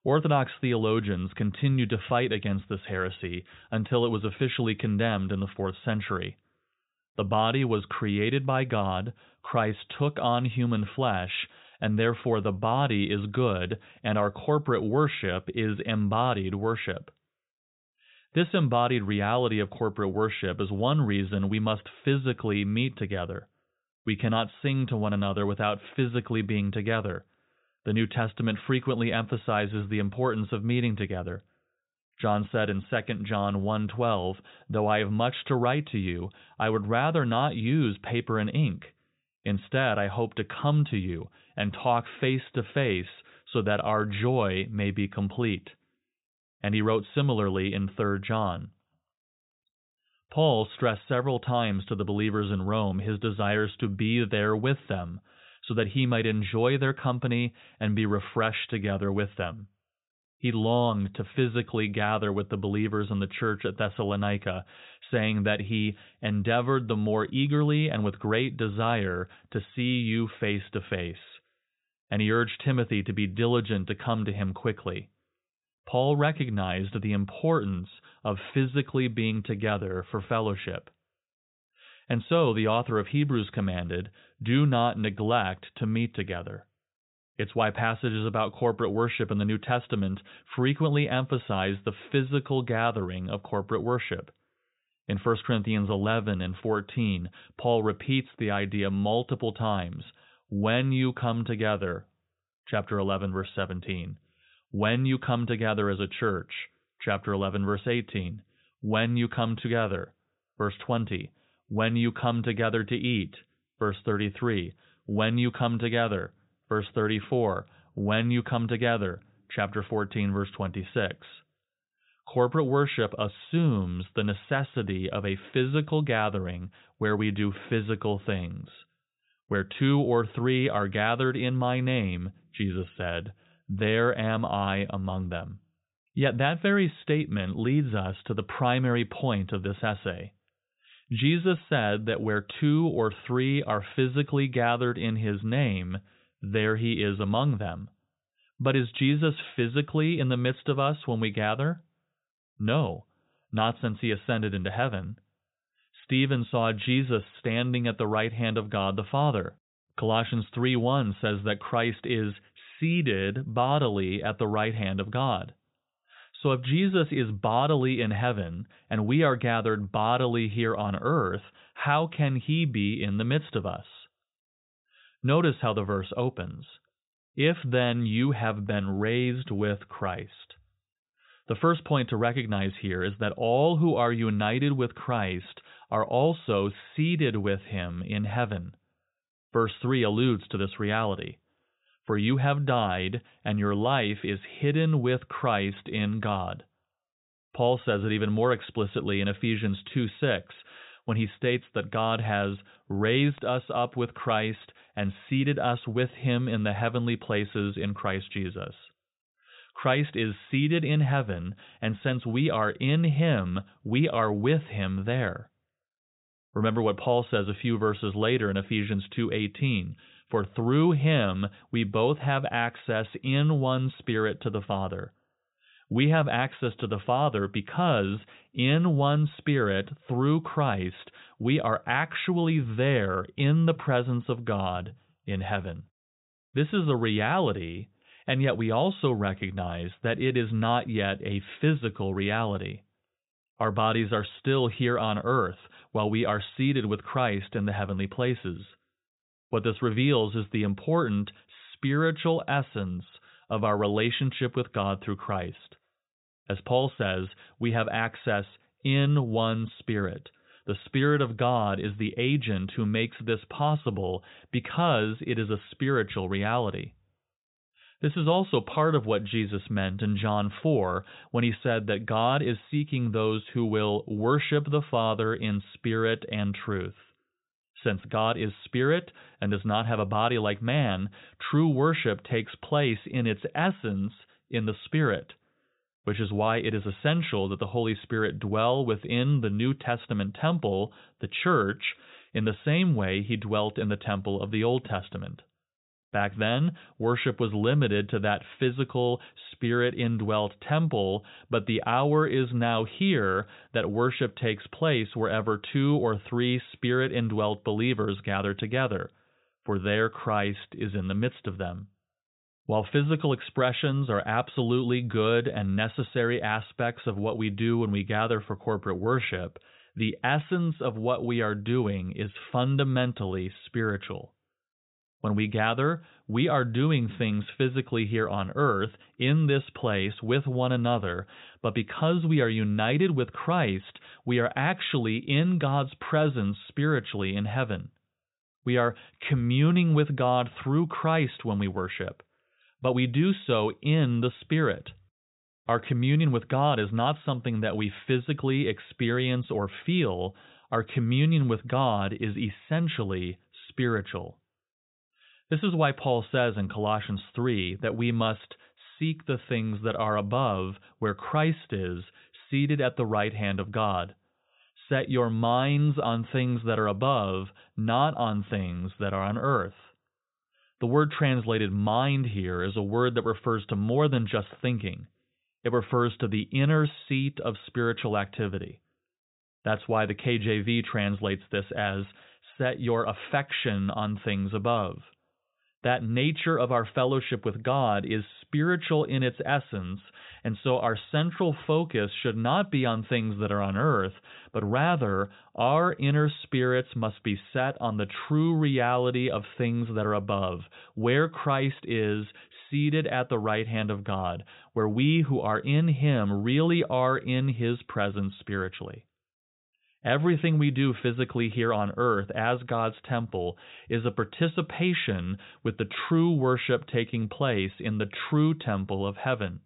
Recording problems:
high frequencies cut off; severe; nothing above 4 kHz

